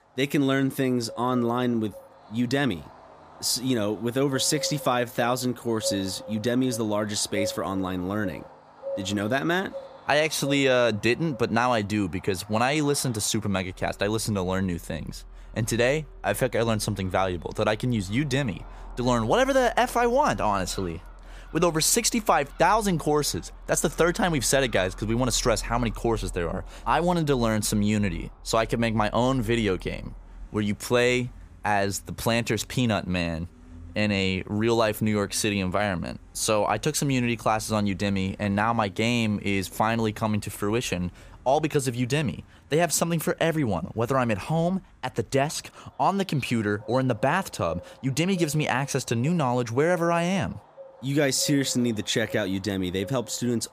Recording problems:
animal sounds; noticeable; throughout; 20 dB below the speech

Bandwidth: 15 kHz